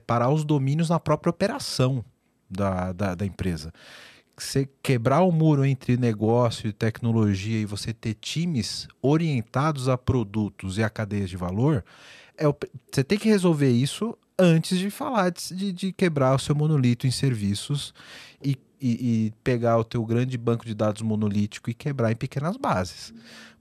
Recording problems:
none

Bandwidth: 13.5 kHz